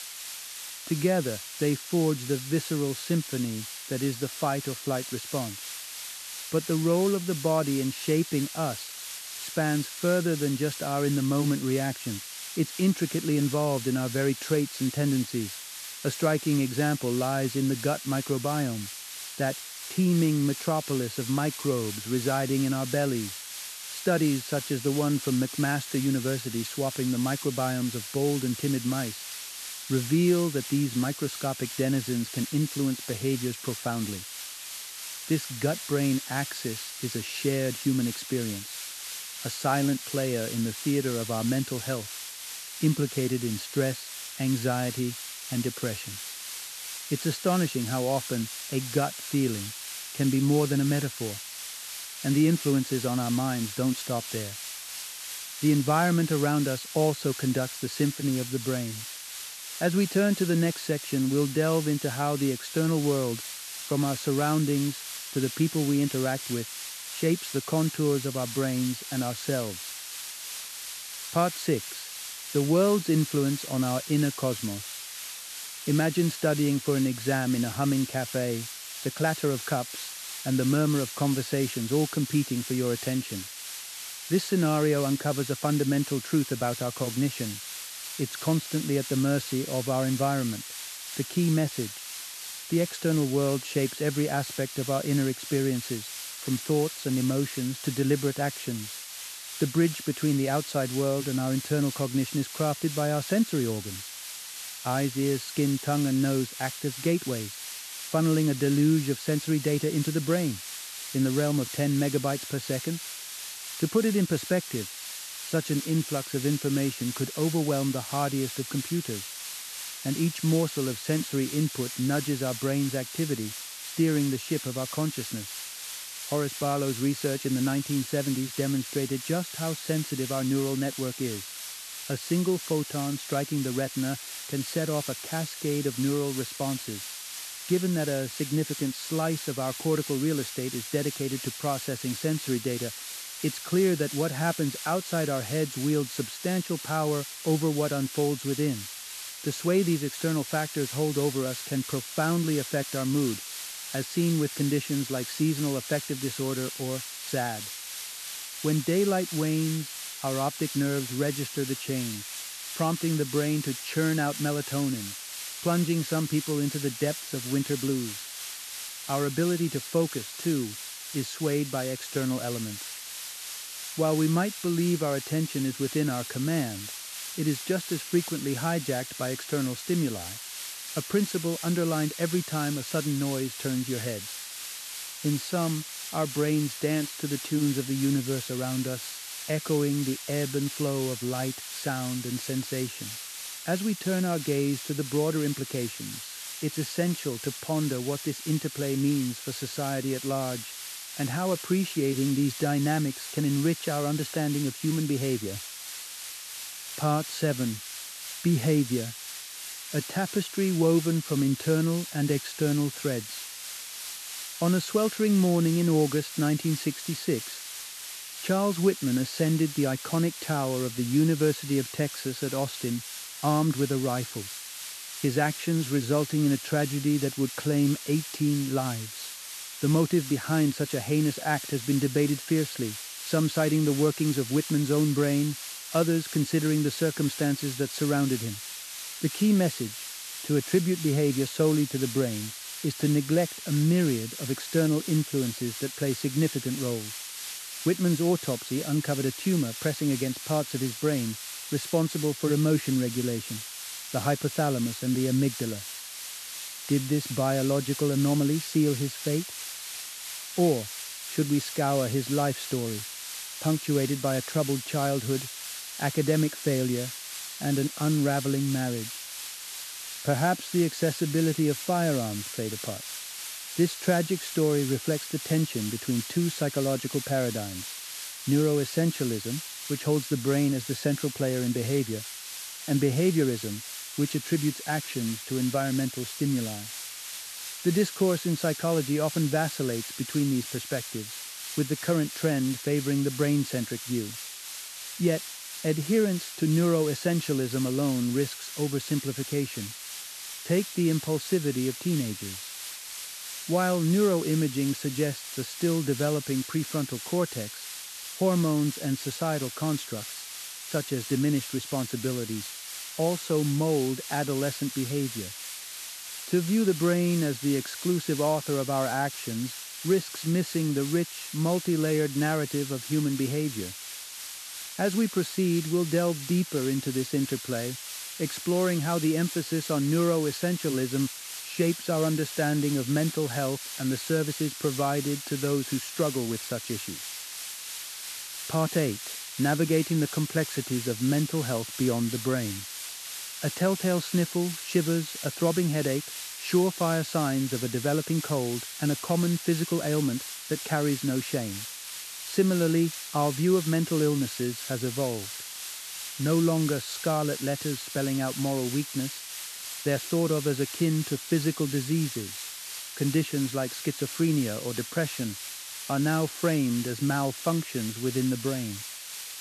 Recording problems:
hiss; loud; throughout; 8 dB below the speech

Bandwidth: 13.5 kHz